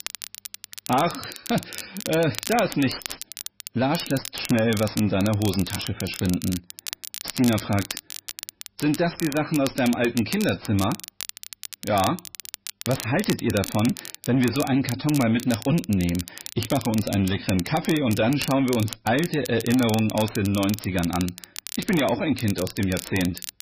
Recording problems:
garbled, watery; badly; nothing above 5.5 kHz
distortion; slight; 10 dB below the speech
crackle, like an old record; noticeable; 10 dB below the speech

